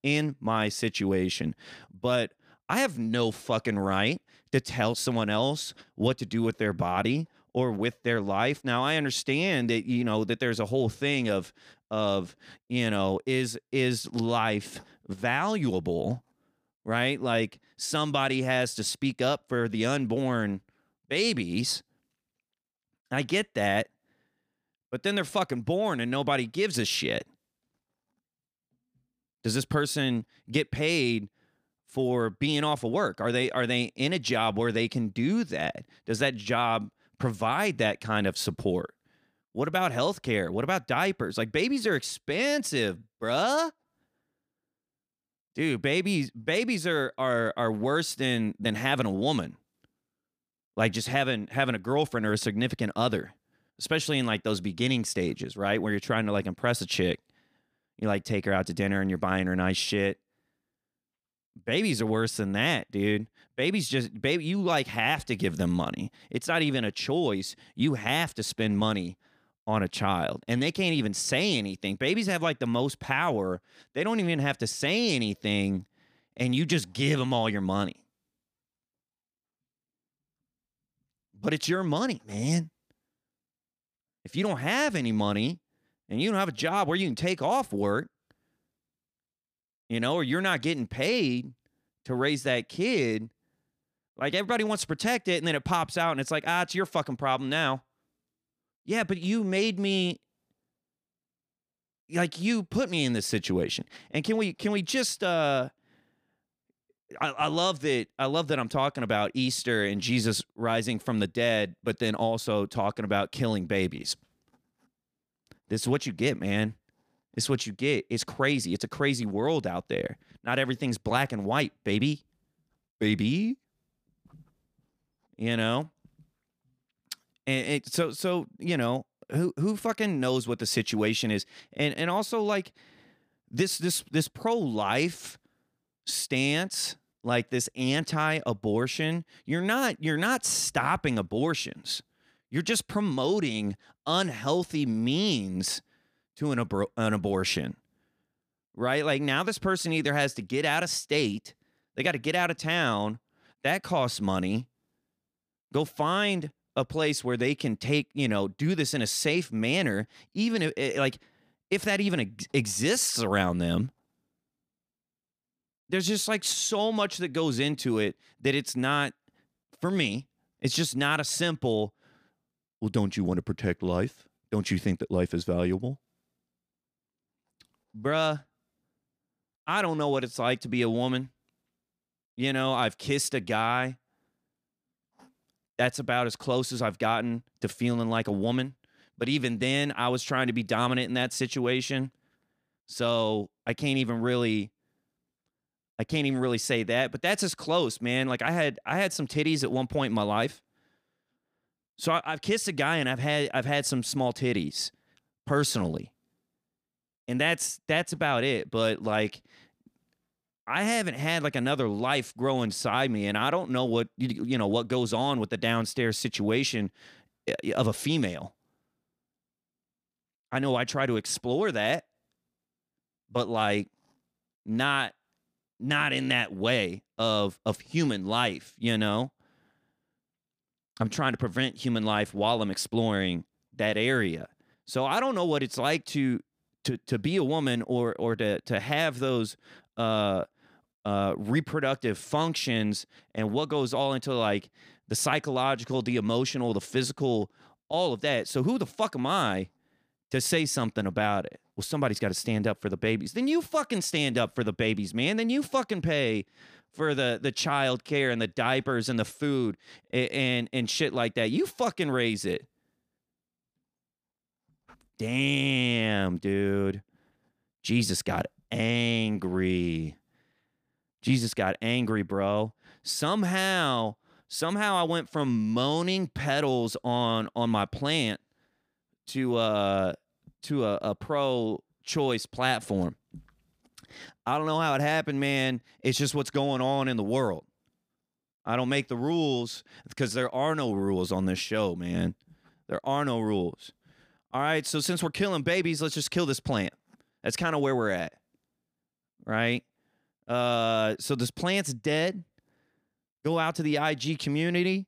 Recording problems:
none

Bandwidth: 15 kHz